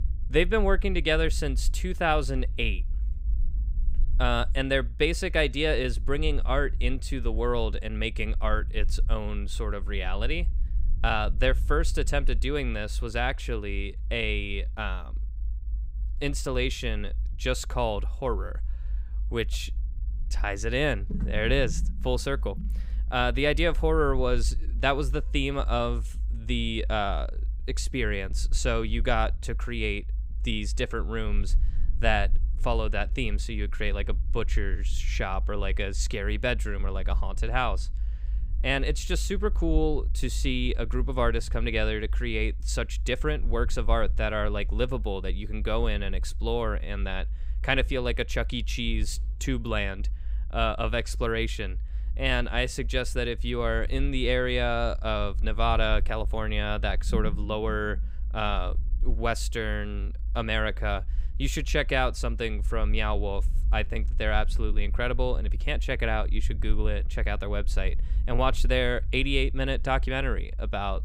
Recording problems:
low rumble; faint; throughout; 25 dB below the speech

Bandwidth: 15.5 kHz